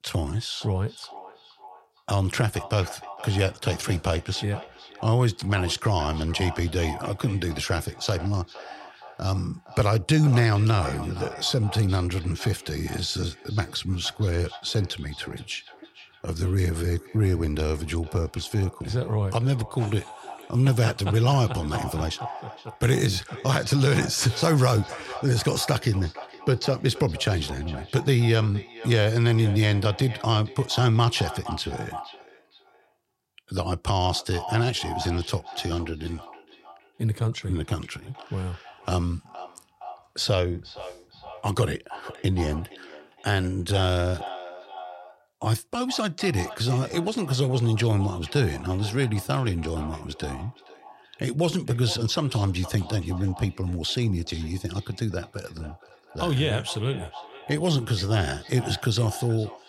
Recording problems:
echo of what is said; noticeable; throughout; 470 ms later, 15 dB below the speech

